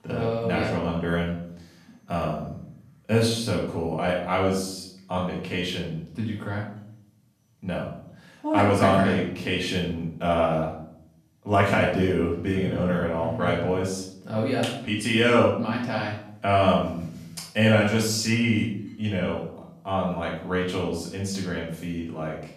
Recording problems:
off-mic speech; far
room echo; noticeable; dies away in 0.6 s

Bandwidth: 14.5 kHz